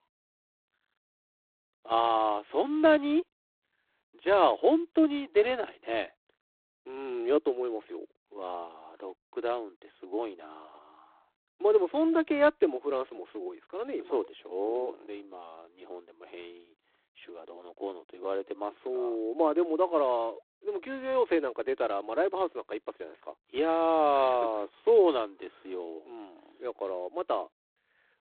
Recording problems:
phone-call audio; poor line; nothing above 3.5 kHz

